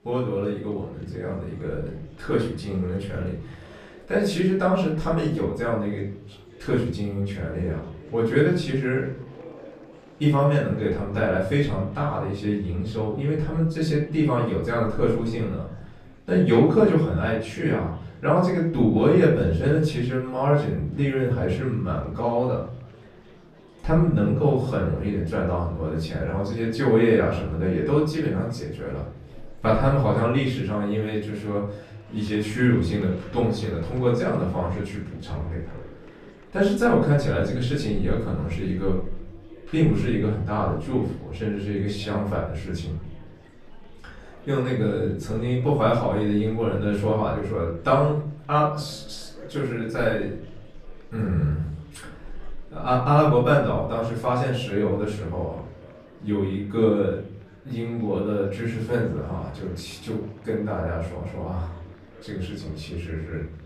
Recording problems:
off-mic speech; far
room echo; noticeable; dies away in 0.6 s
chatter from many people; faint; throughout; 25 dB below the speech

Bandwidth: 14 kHz